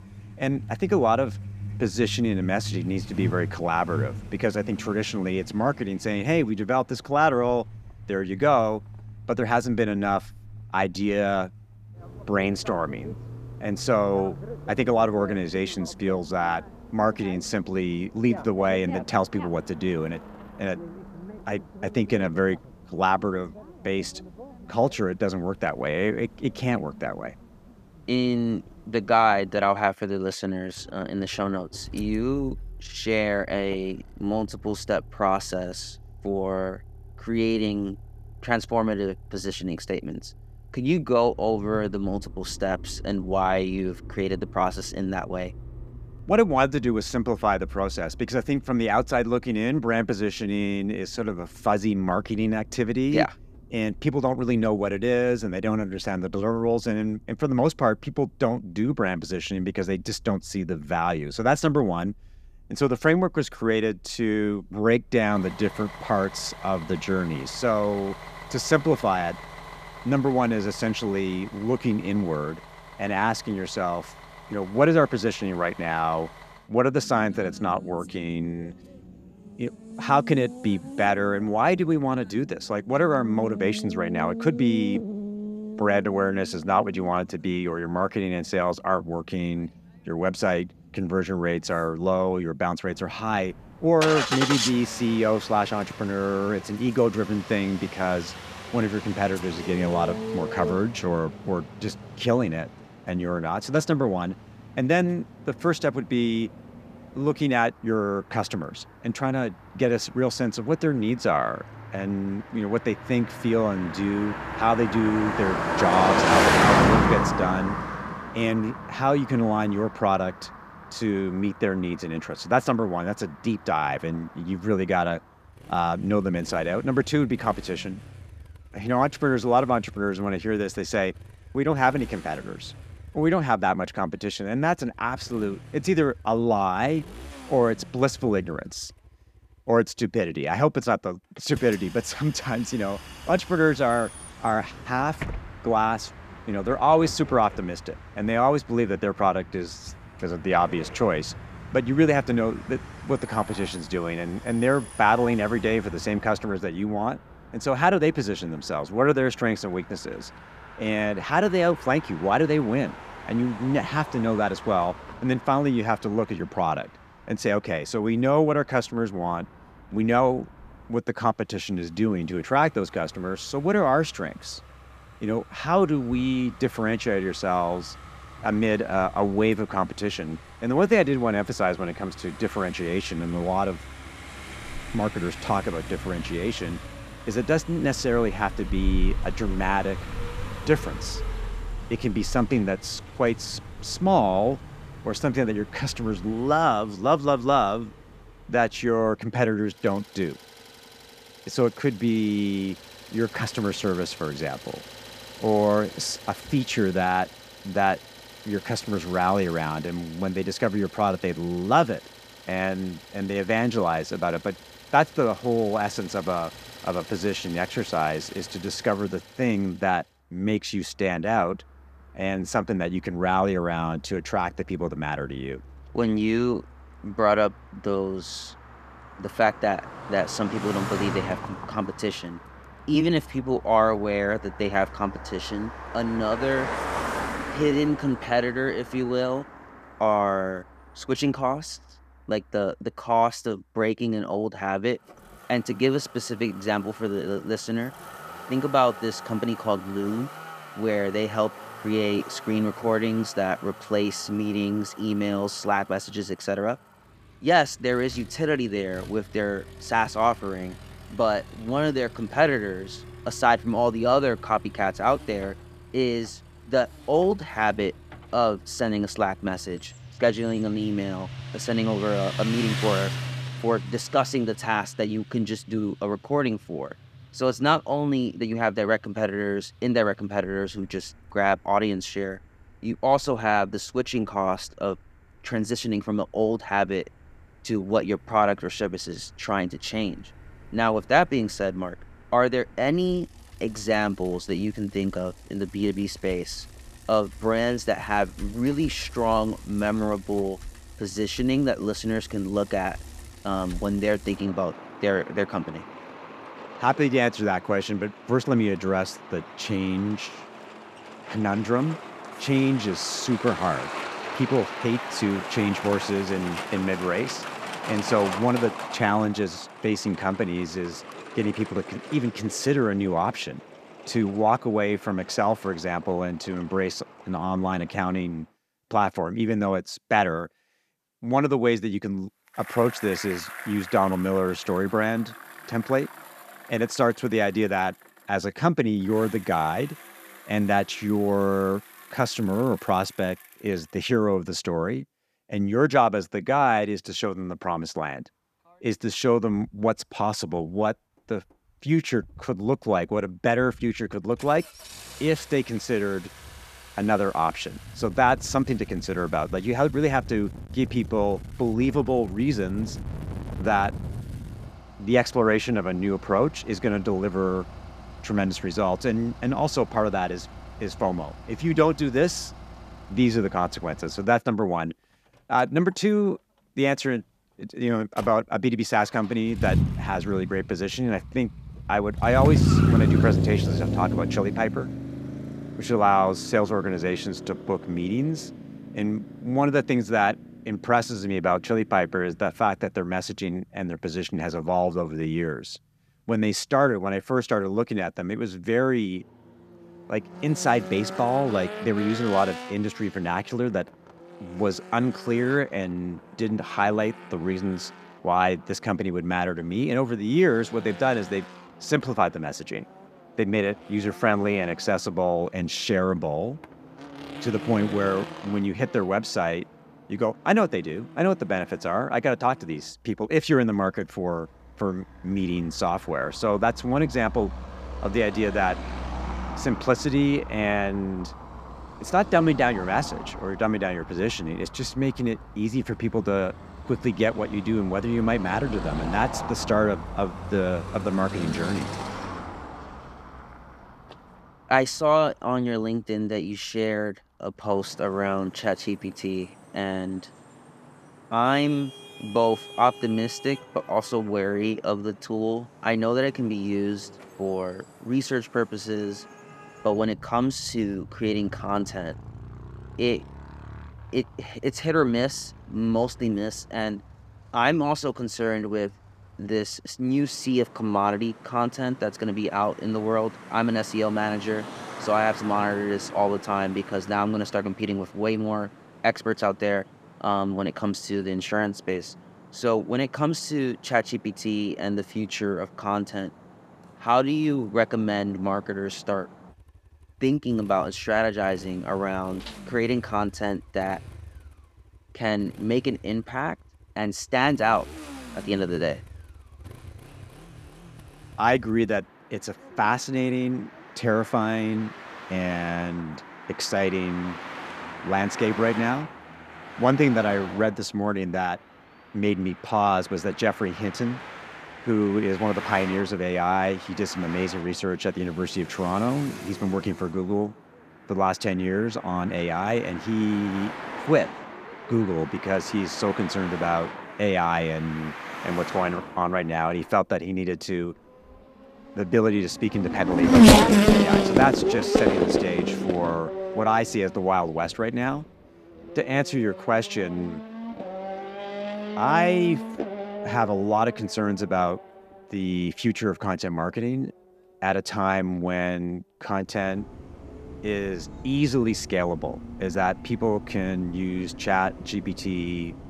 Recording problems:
traffic noise; loud; throughout; 8 dB below the speech

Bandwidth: 14.5 kHz